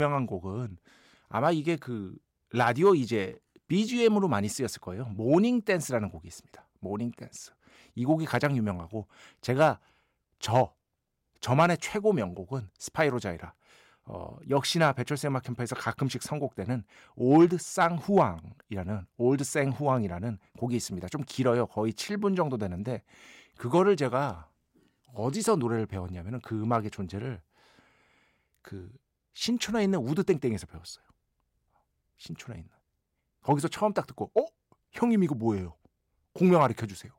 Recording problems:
abrupt cut into speech; at the start

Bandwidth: 16 kHz